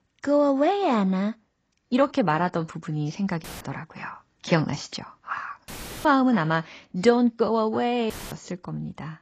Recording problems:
garbled, watery; badly; nothing above 8 kHz
uneven, jittery; slightly; from 0.5 to 7.5 s
audio cutting out; filled with static; at 3.5 s, at 5.5 s and at 8 s

